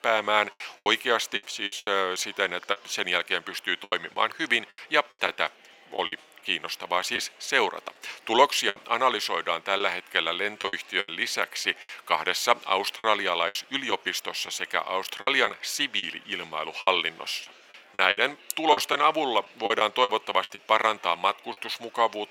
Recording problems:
thin; very; fading below 800 Hz
murmuring crowd; faint; throughout; 25 dB below the speech
choppy; very; 9% of the speech affected

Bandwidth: 16.5 kHz